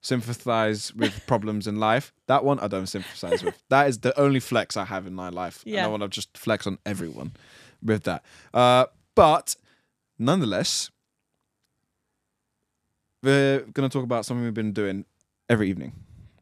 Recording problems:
none

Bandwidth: 14.5 kHz